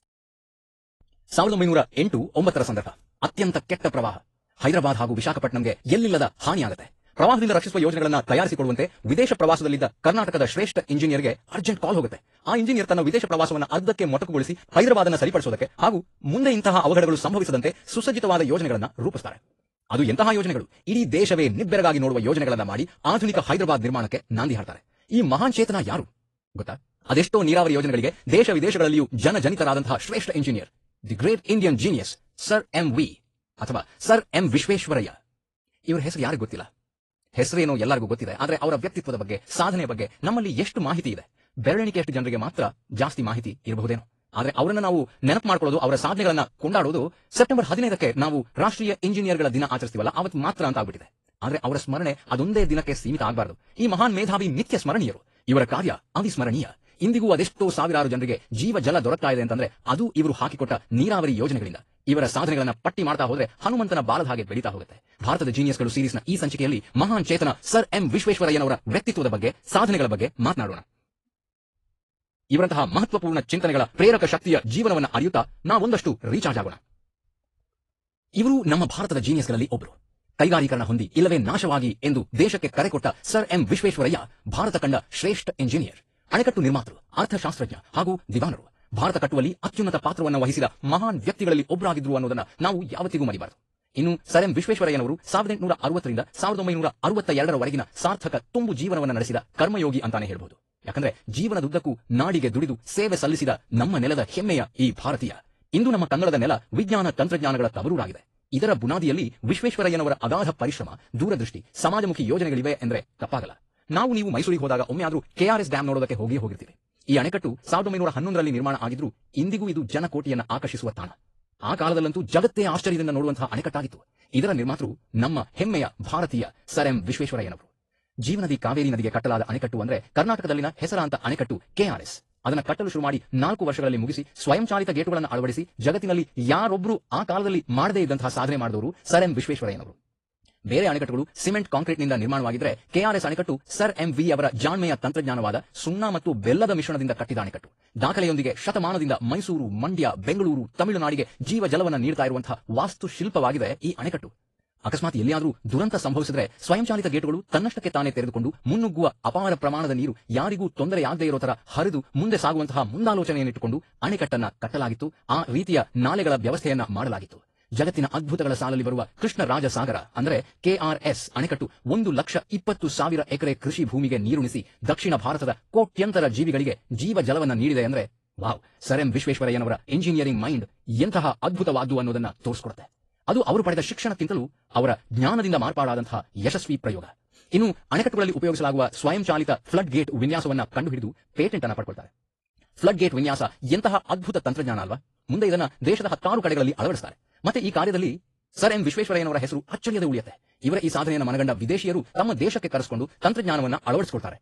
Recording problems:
wrong speed, natural pitch; too fast; 1.7 times normal speed
garbled, watery; slightly

